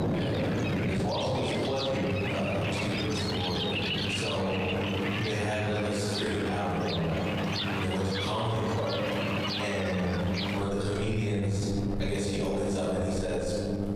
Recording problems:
room echo; strong; dies away in 1.7 s
off-mic speech; far
squashed, flat; somewhat
electrical hum; loud; throughout; 50 Hz, 10 dB below the speech
rain or running water; loud; throughout; 2 dB below the speech

